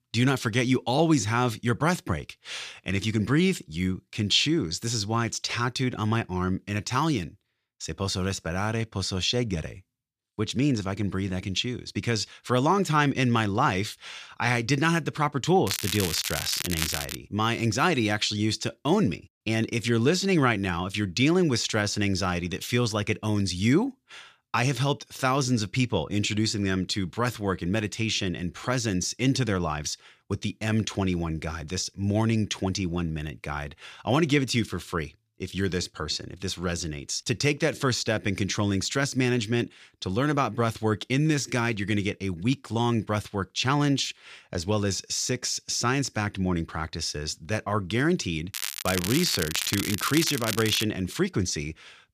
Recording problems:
crackling; loud; from 16 to 17 s and from 49 to 51 s; 4 dB below the speech

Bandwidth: 14.5 kHz